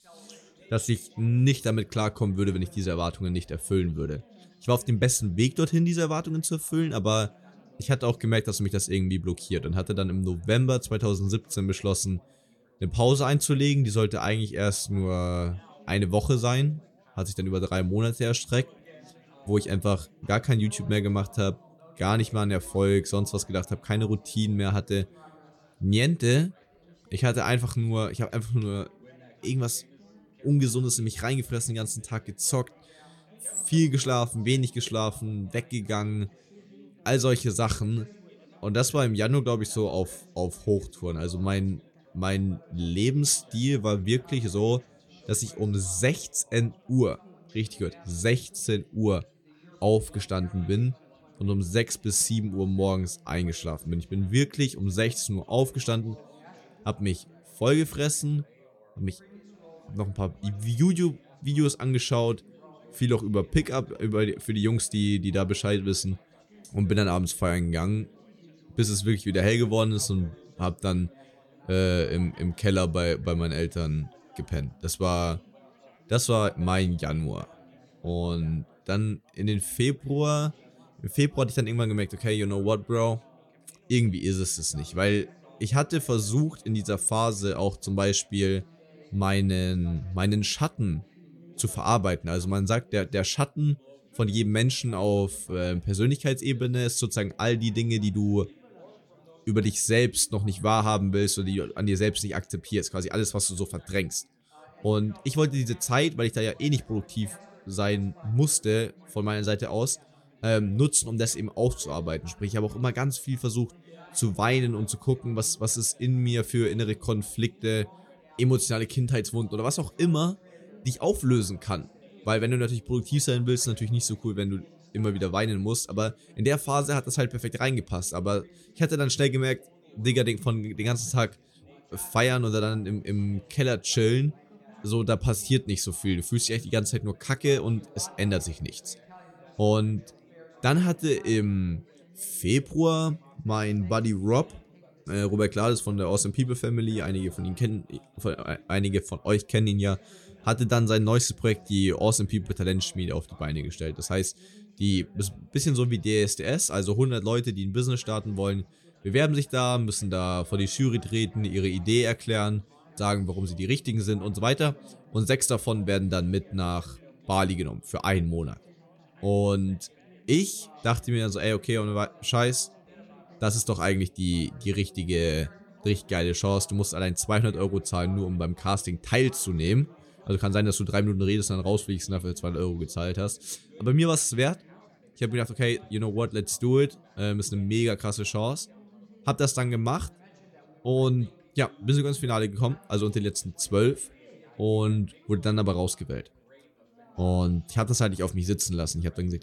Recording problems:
background chatter; faint; throughout; 4 voices, 25 dB below the speech

